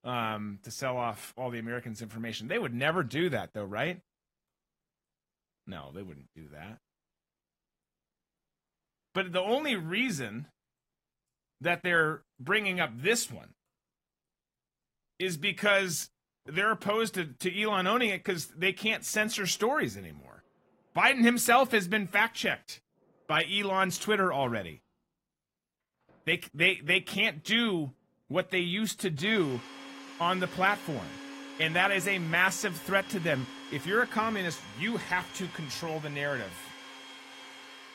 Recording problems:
garbled, watery; slightly; nothing above 16 kHz
household noises; noticeable; throughout; 15 dB below the speech

